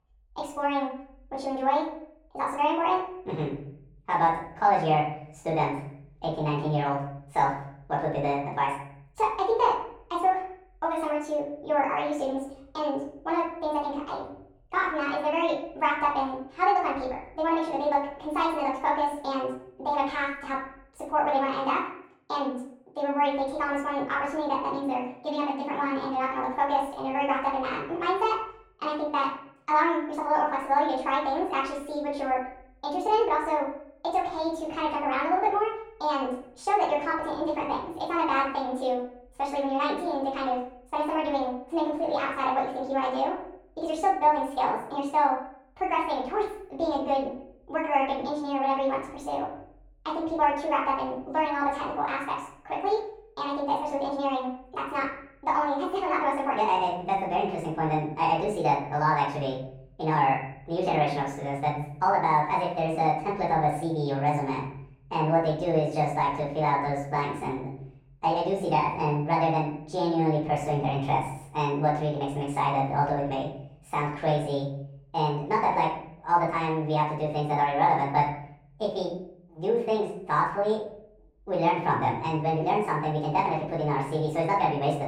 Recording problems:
off-mic speech; far
wrong speed and pitch; too fast and too high; 1.5 times normal speed
room echo; noticeable; dies away in 0.6 s
muffled; slightly; fading above 2 kHz

